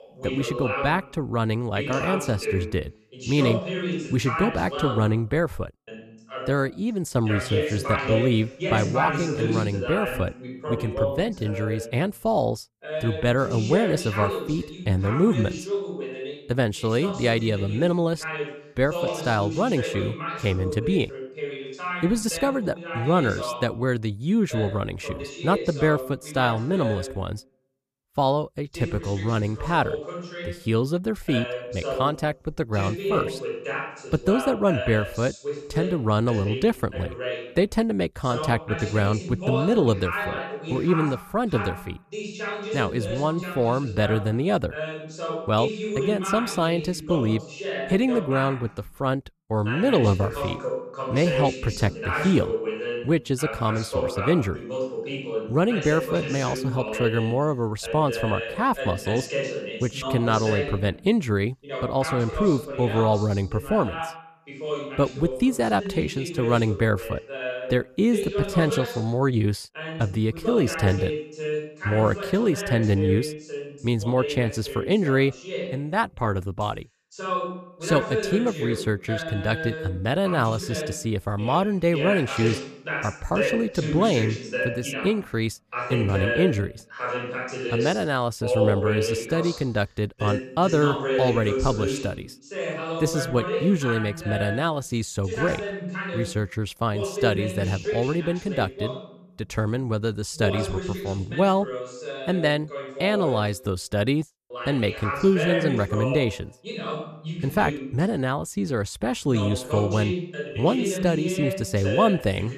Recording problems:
voice in the background; loud; throughout; 6 dB below the speech

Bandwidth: 14.5 kHz